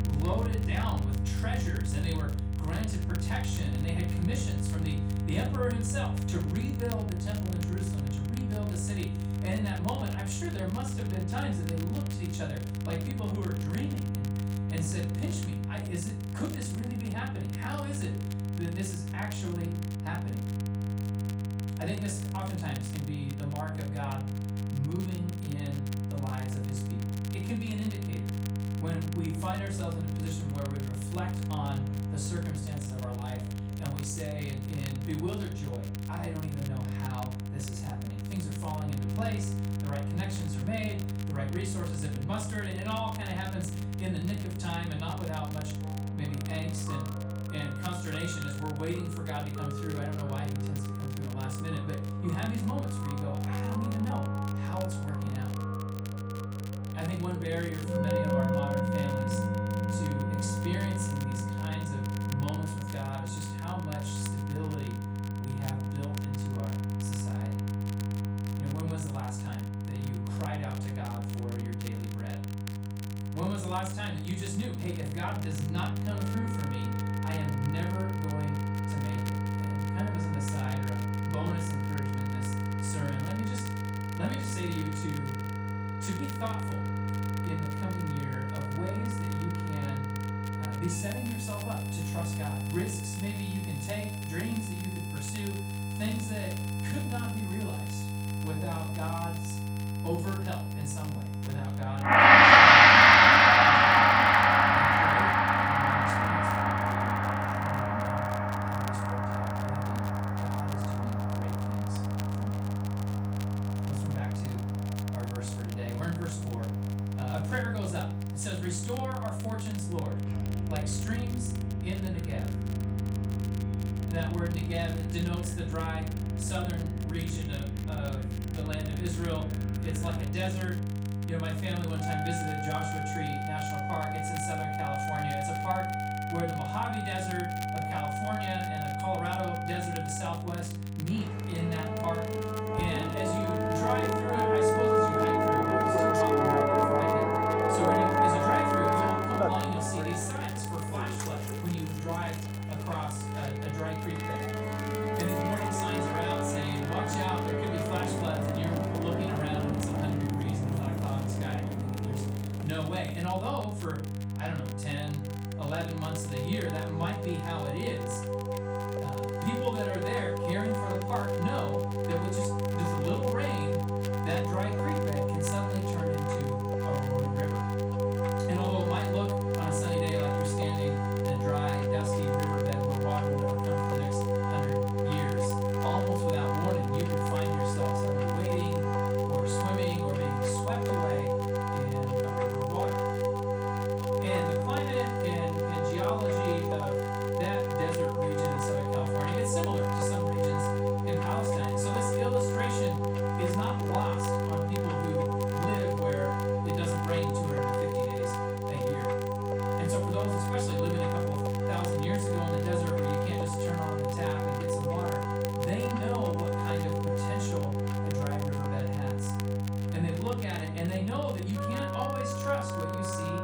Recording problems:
off-mic speech; far
room echo; slight; dies away in 0.4 s
background music; very loud; throughout; 9 dB above the speech
electrical hum; loud; throughout; 50 Hz, 5 dB below the speech
crackle, like an old record; noticeable; 15 dB below the speech

